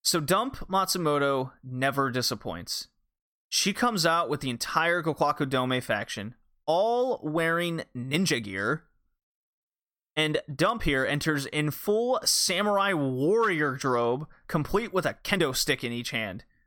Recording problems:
uneven, jittery; strongly; from 1.5 to 15 s

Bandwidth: 17 kHz